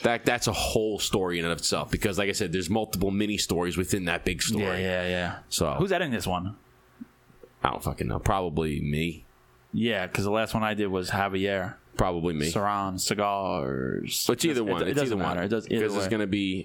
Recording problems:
squashed, flat; heavily

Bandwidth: 17.5 kHz